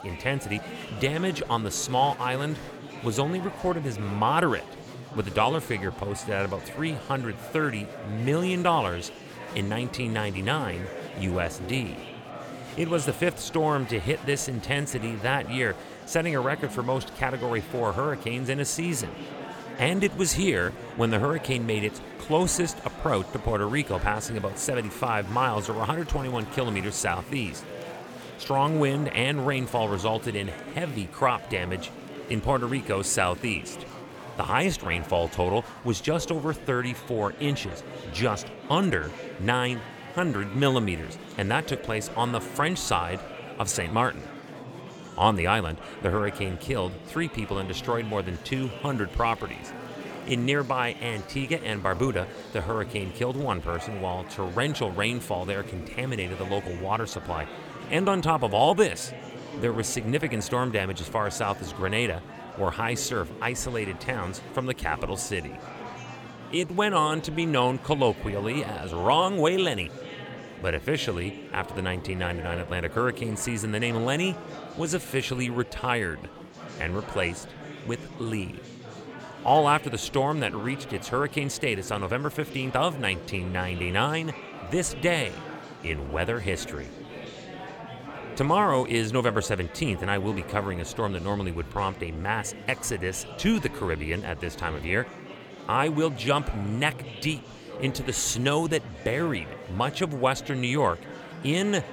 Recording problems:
murmuring crowd; noticeable; throughout; 15 dB below the speech

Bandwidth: 18.5 kHz